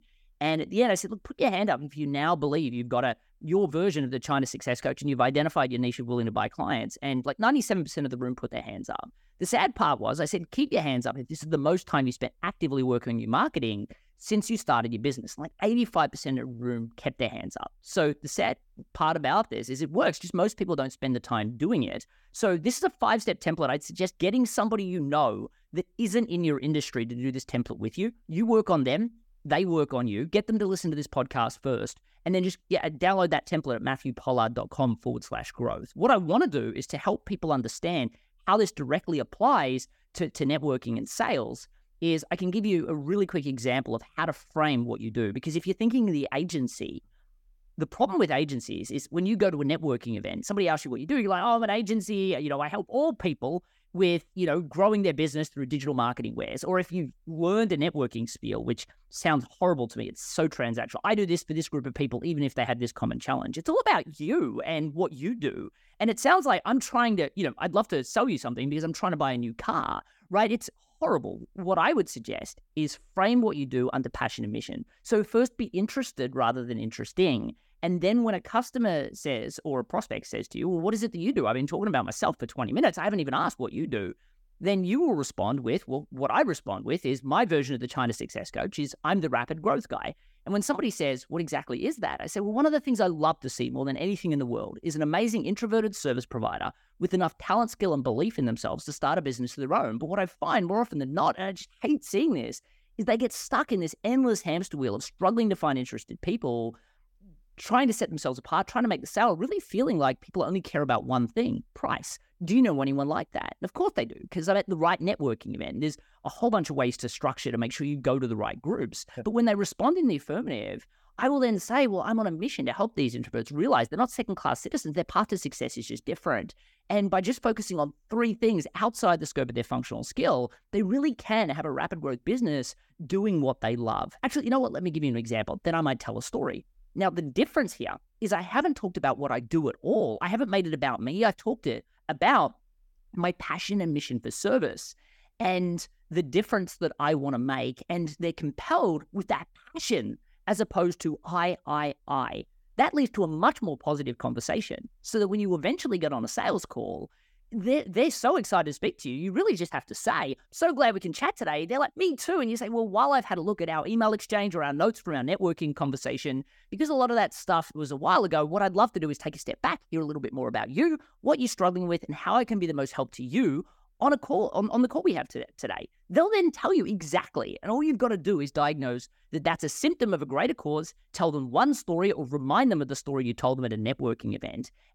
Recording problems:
none

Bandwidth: 17.5 kHz